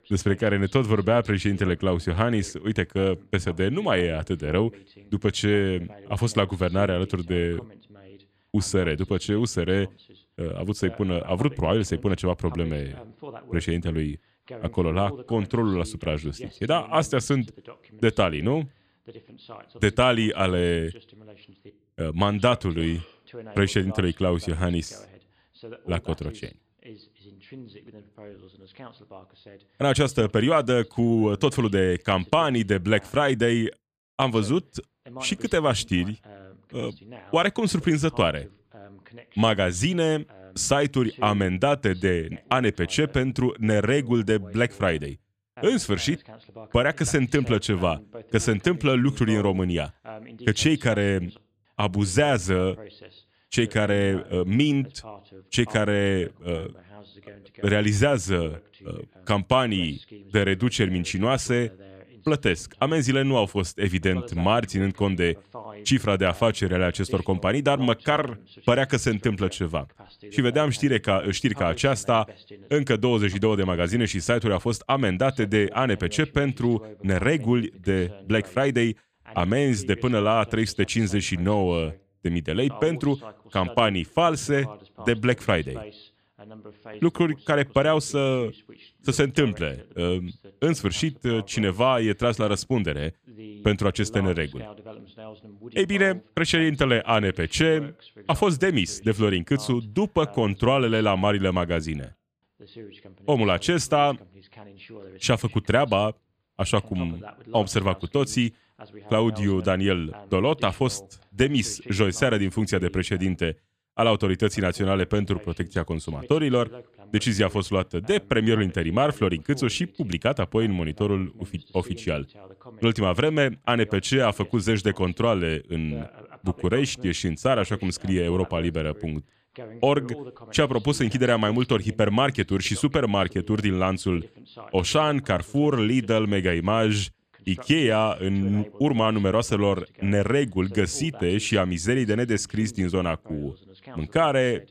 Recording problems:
voice in the background; faint; throughout; 20 dB below the speech

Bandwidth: 14.5 kHz